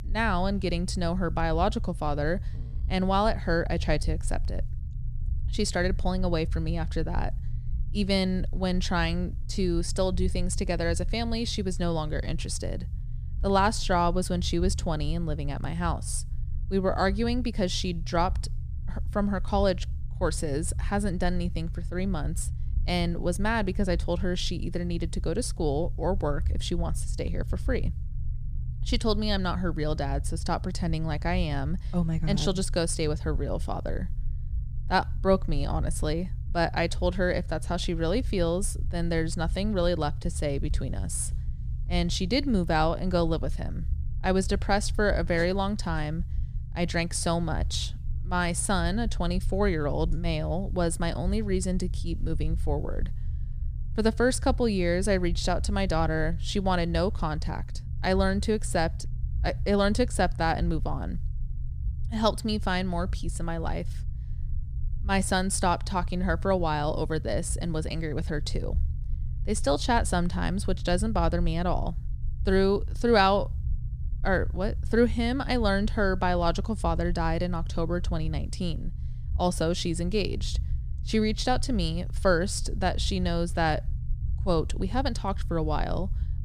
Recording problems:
low rumble; faint; throughout; 20 dB below the speech

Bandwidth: 14.5 kHz